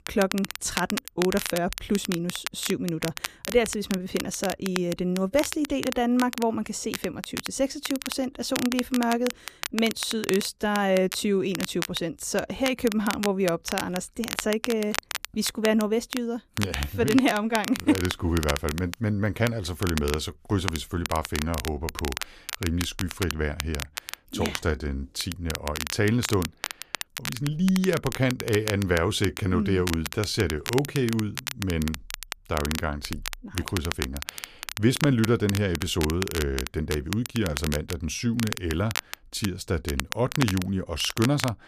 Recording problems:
crackle, like an old record; loud; 7 dB below the speech

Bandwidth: 14.5 kHz